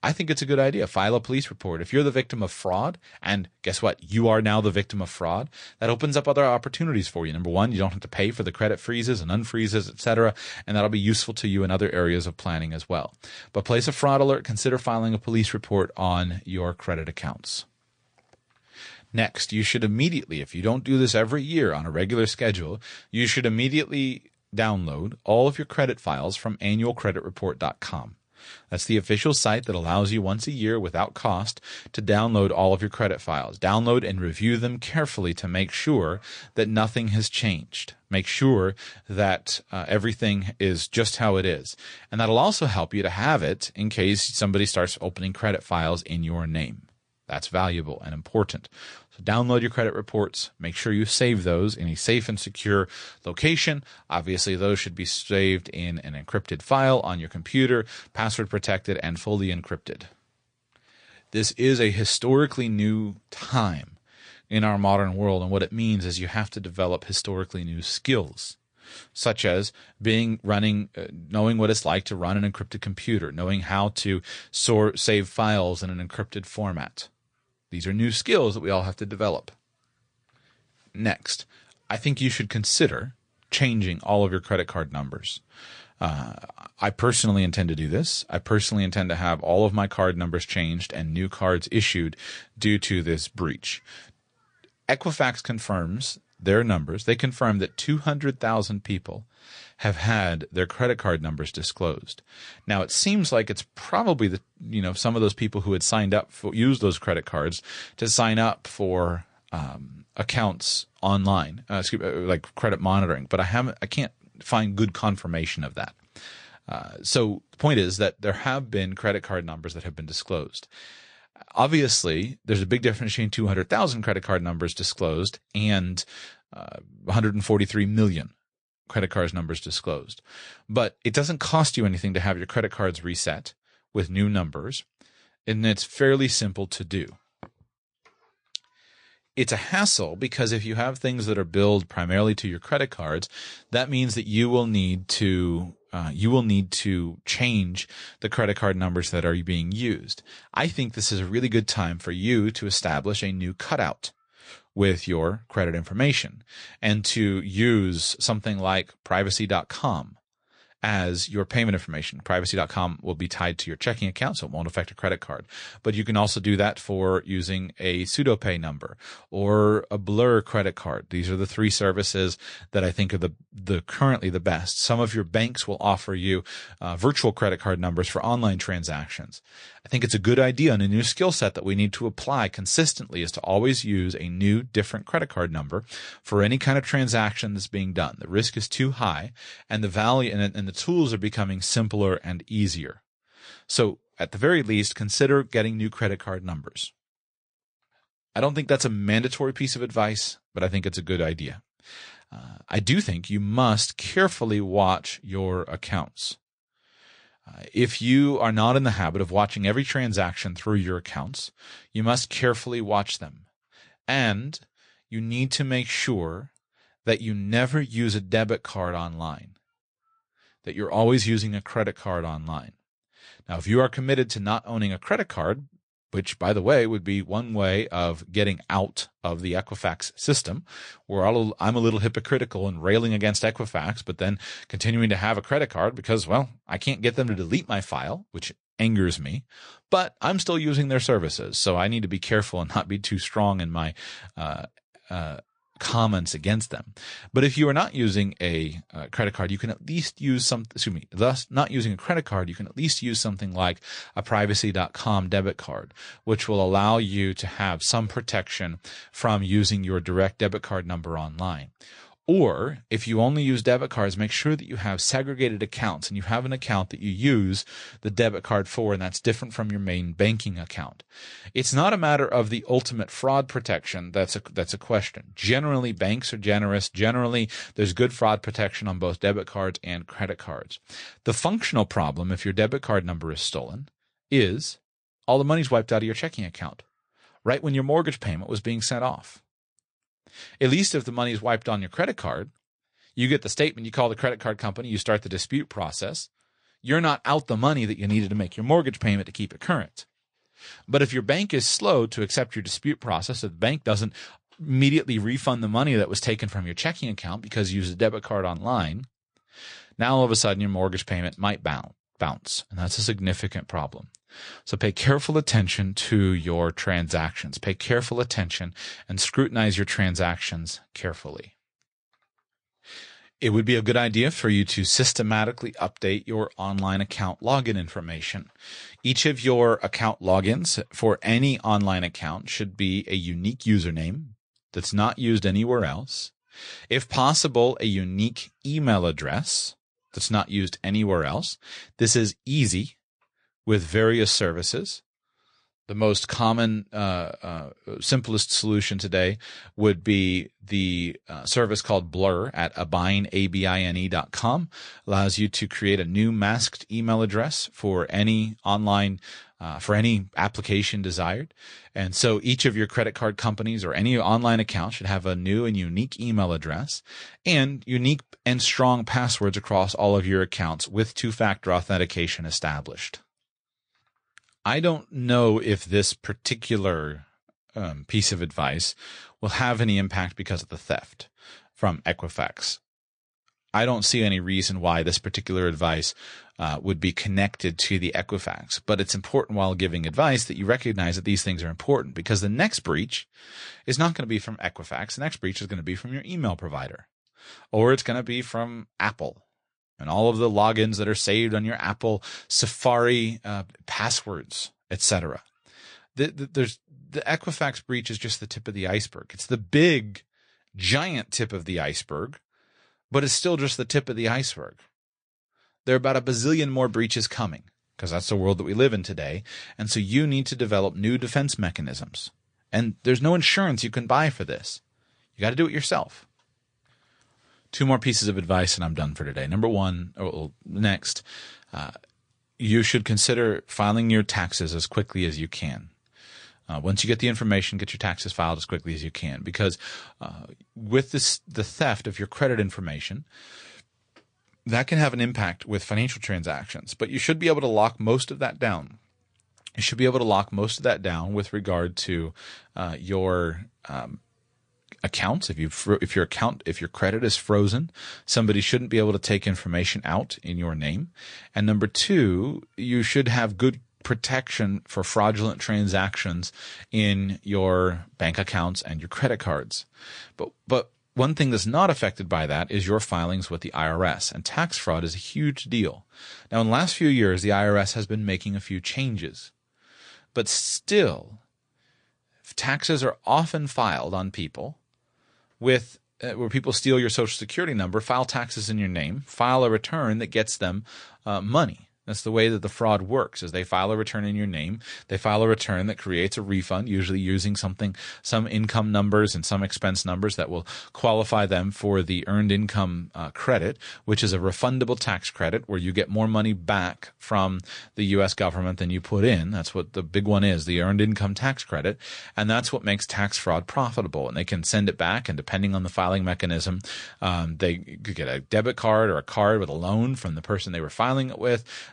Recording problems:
garbled, watery; slightly; nothing above 9.5 kHz

